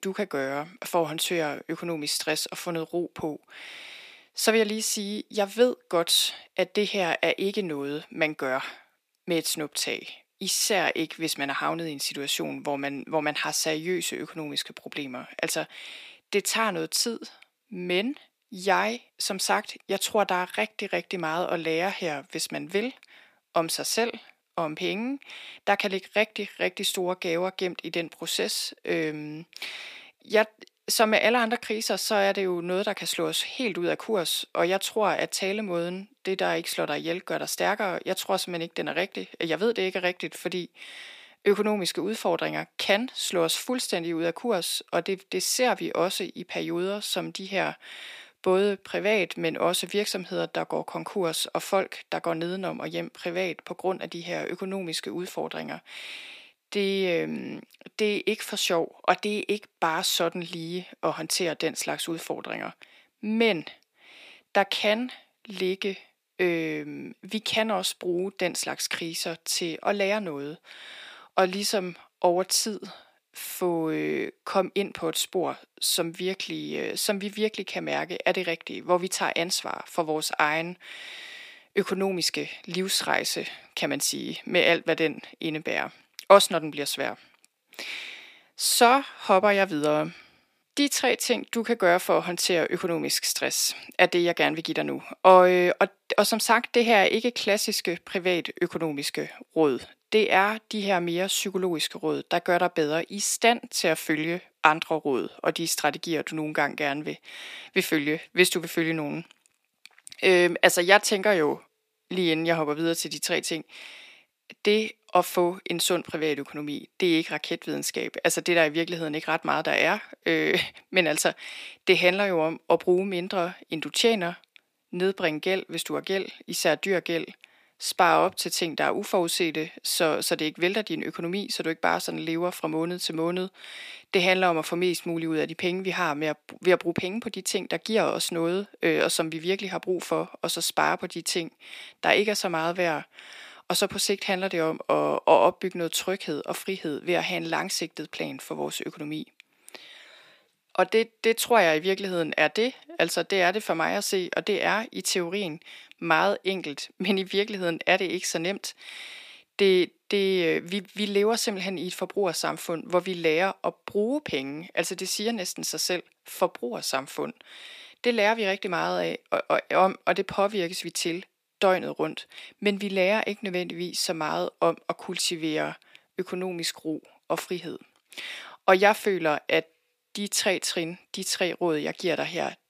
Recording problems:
thin; somewhat; fading below 350 Hz

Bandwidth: 15 kHz